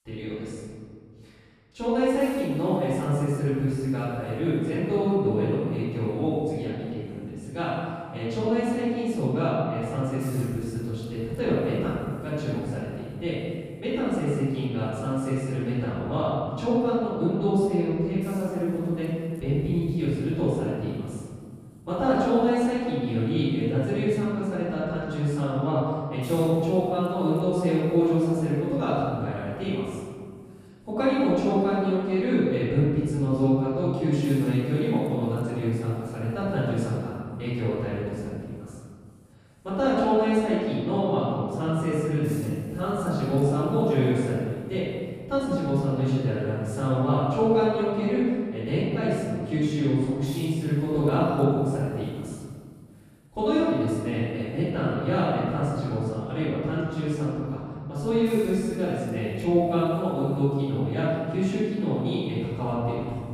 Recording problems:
room echo; strong; dies away in 1.9 s
off-mic speech; far
hiss; very faint; throughout; 30 dB below the speech

